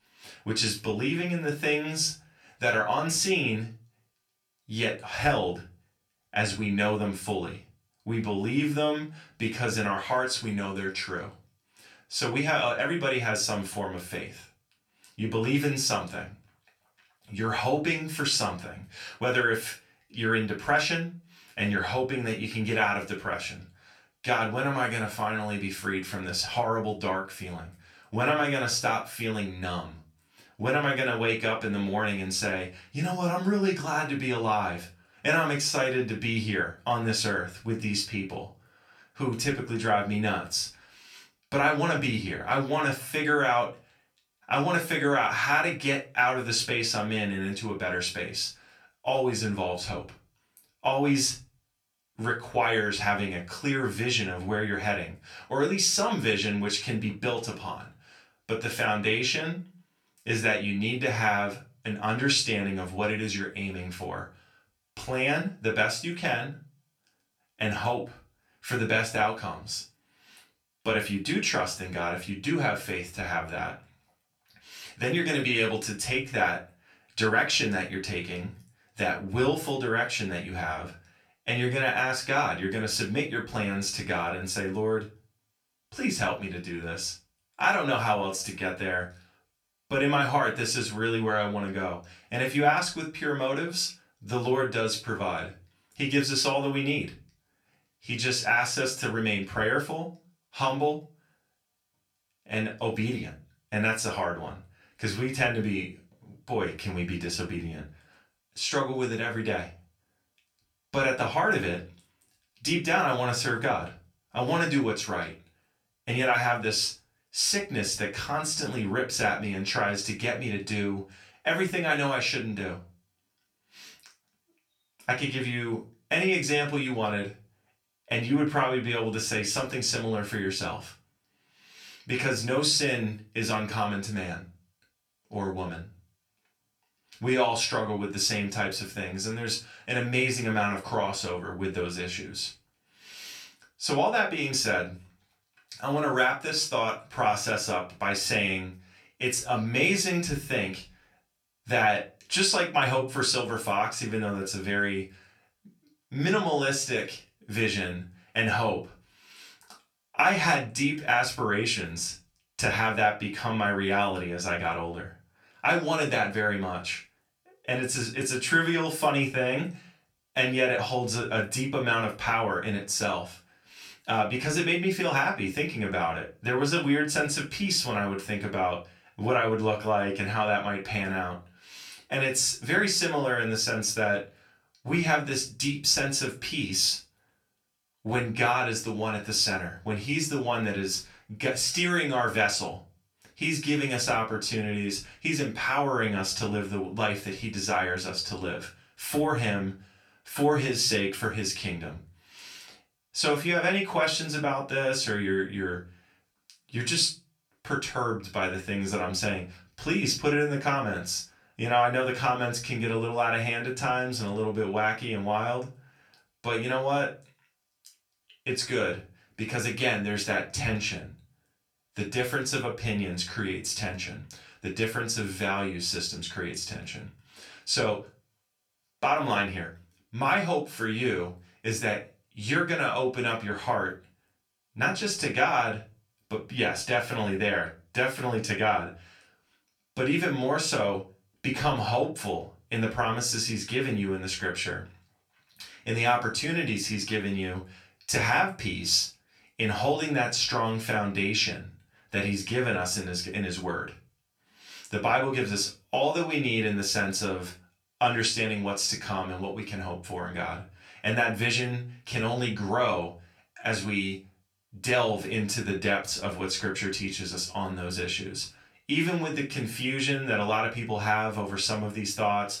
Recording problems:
off-mic speech; far
room echo; slight; dies away in 0.3 s

